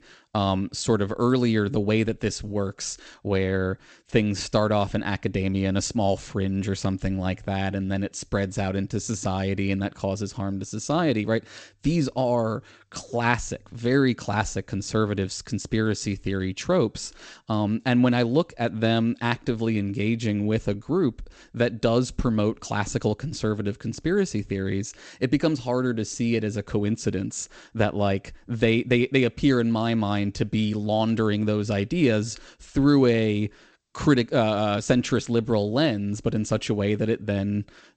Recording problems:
garbled, watery; slightly; nothing above 8 kHz

